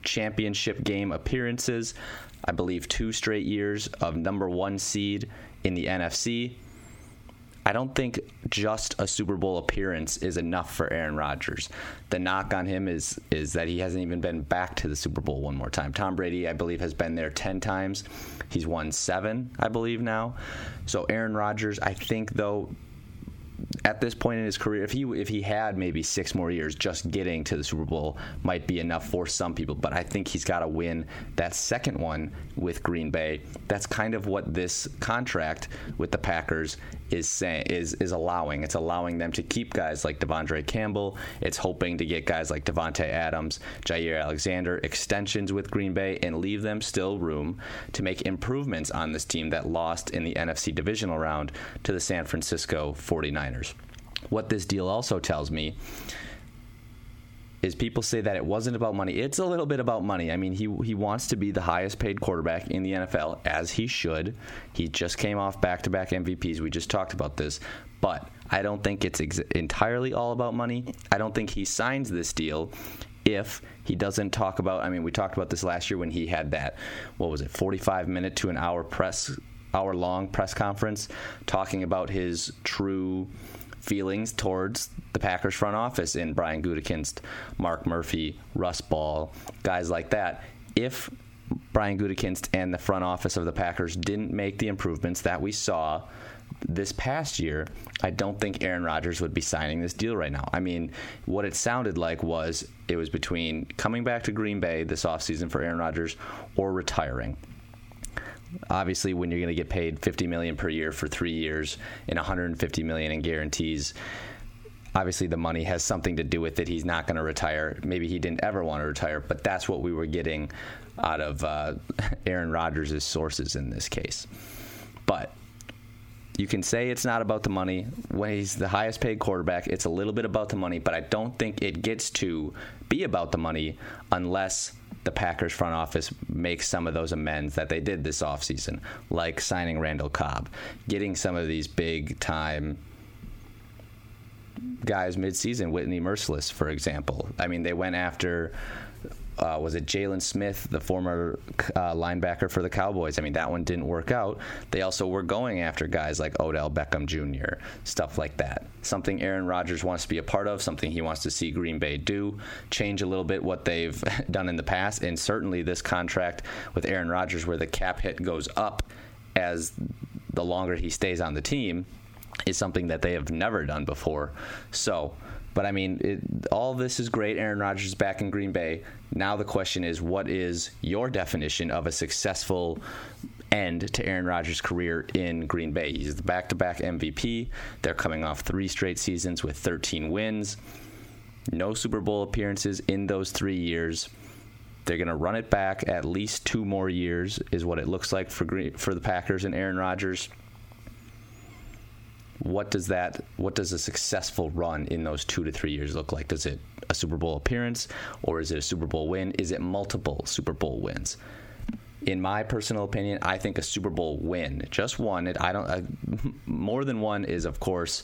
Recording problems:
squashed, flat; heavily

